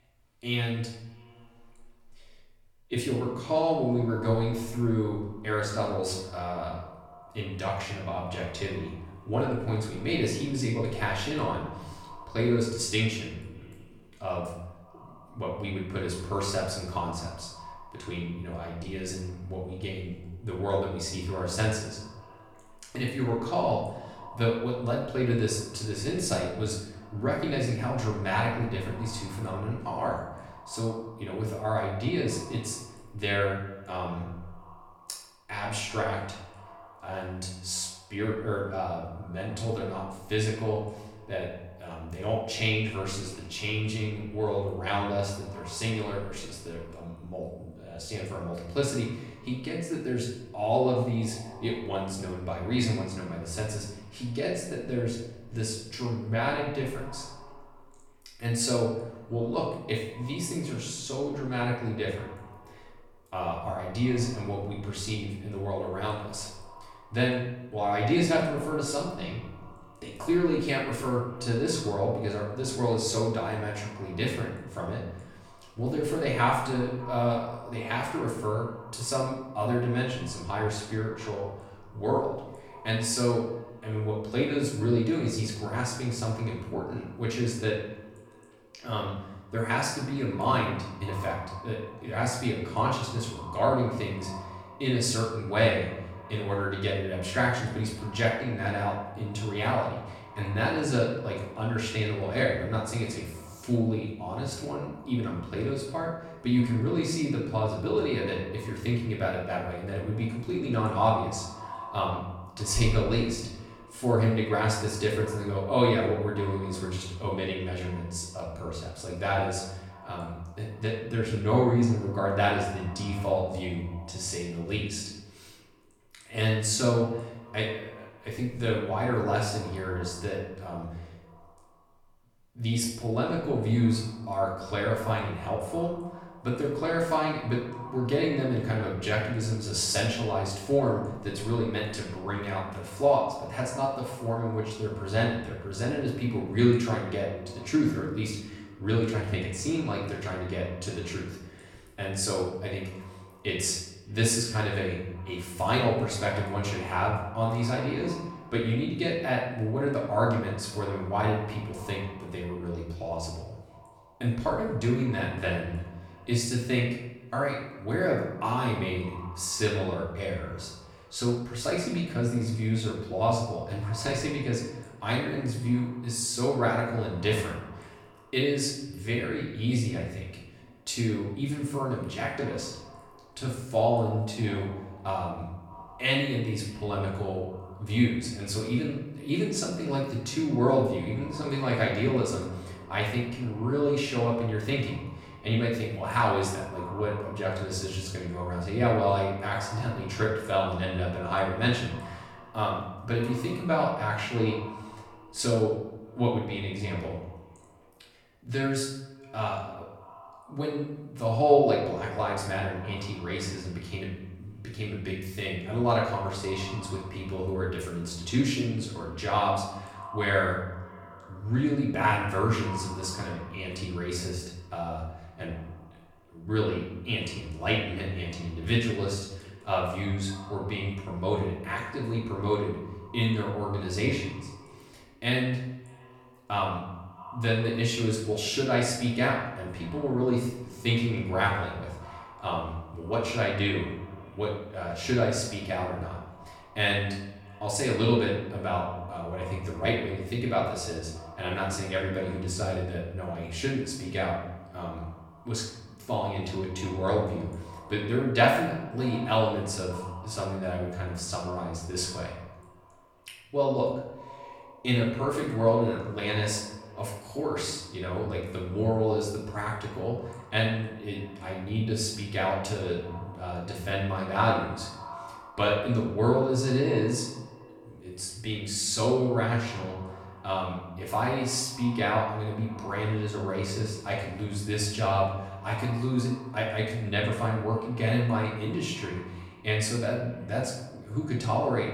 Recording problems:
off-mic speech; far
room echo; noticeable; dies away in 0.8 s
echo of what is said; faint; throughout; 290 ms later, 20 dB below the speech

